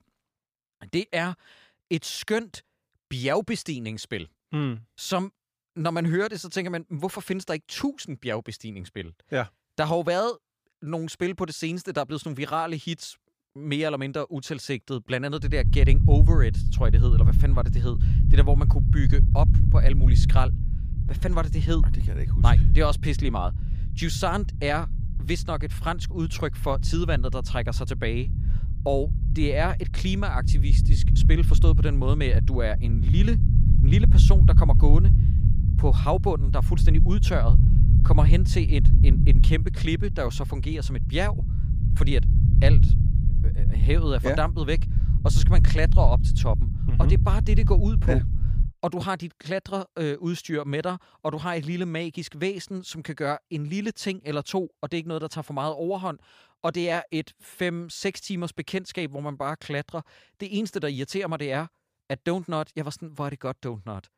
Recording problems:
low rumble; loud; from 15 to 49 s; 8 dB below the speech

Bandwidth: 15 kHz